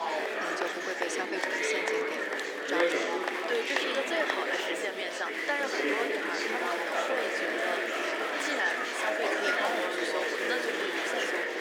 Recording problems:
thin; very; fading below 300 Hz
murmuring crowd; very loud; throughout; 5 dB above the speech

